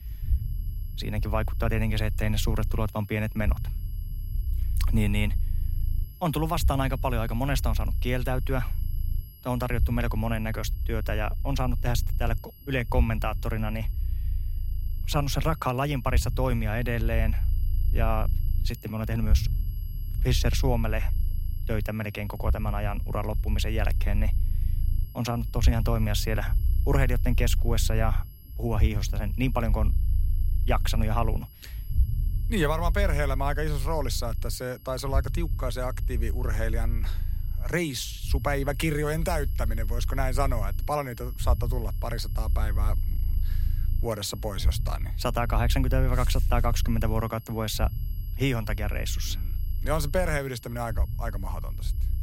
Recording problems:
low rumble; noticeable; throughout; 20 dB below the speech
high-pitched whine; faint; throughout; 11.5 kHz, 20 dB below the speech

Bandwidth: 16 kHz